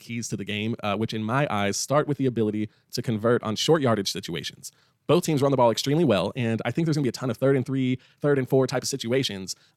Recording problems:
wrong speed, natural pitch; too fast; 1.5 times normal speed

